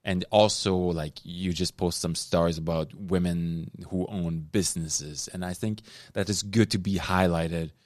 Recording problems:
none

